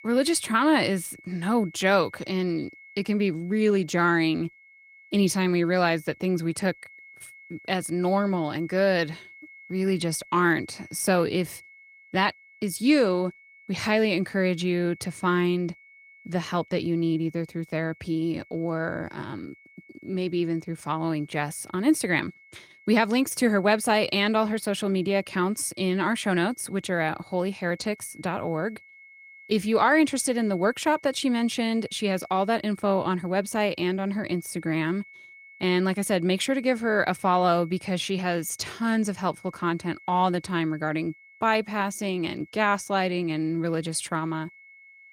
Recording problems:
garbled, watery; slightly; nothing above 16 kHz
high-pitched whine; faint; throughout; 2 kHz, 25 dB below the speech

